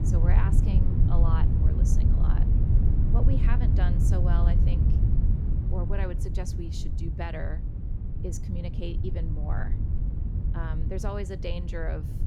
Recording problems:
wind noise on the microphone; heavy; 2 dB below the speech

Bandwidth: 17 kHz